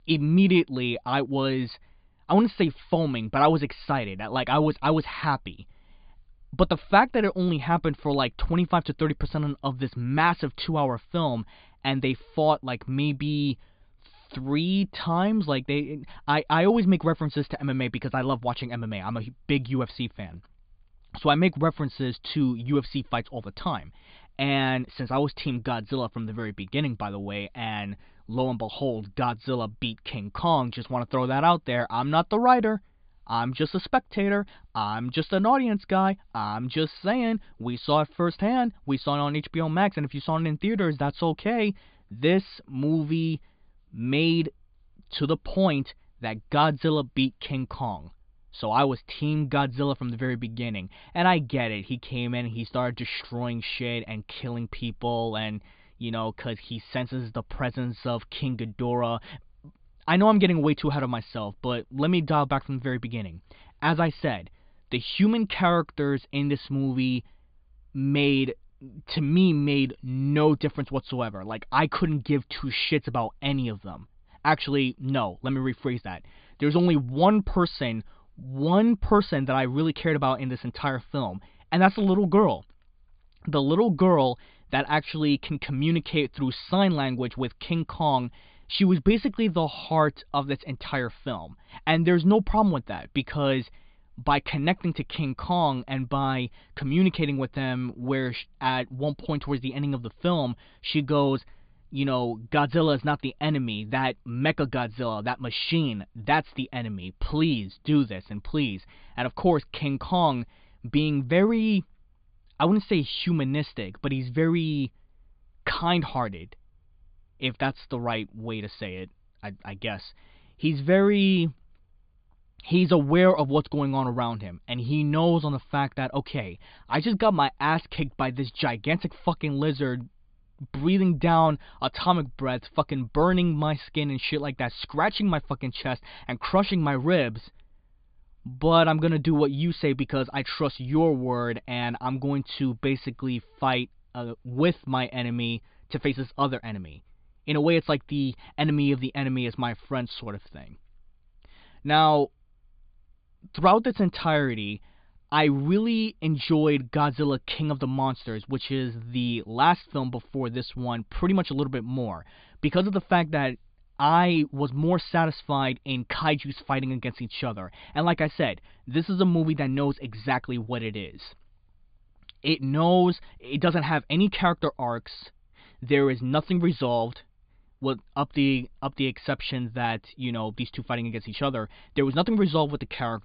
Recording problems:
high frequencies cut off; severe; nothing above 4.5 kHz

